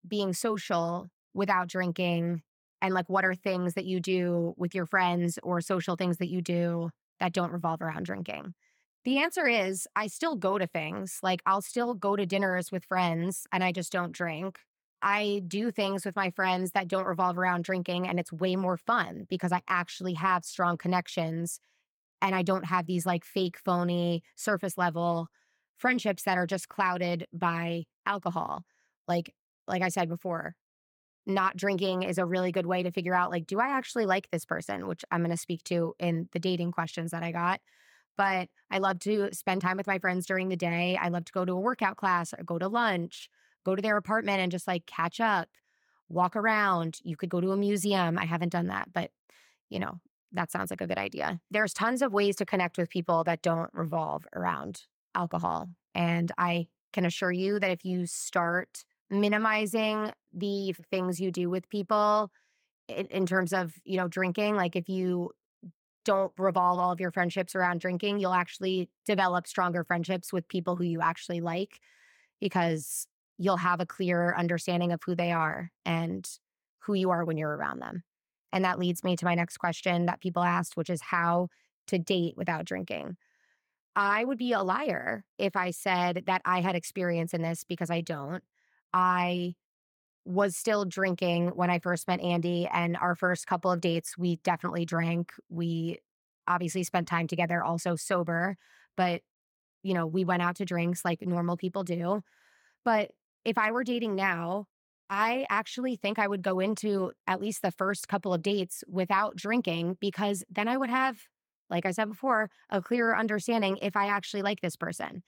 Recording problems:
uneven, jittery; slightly; from 15 s to 1:46

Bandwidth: 18.5 kHz